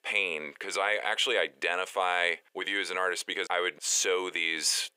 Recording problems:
thin; very; fading below 450 Hz

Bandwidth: 15.5 kHz